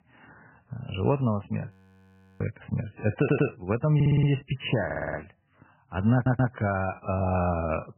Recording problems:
garbled, watery; badly; nothing above 3 kHz
audio freezing; at 1.5 s for 0.5 s
audio stuttering; 4 times, first at 3 s

